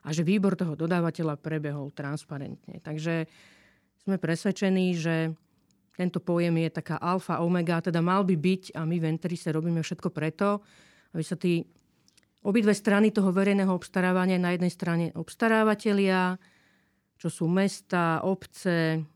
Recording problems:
none

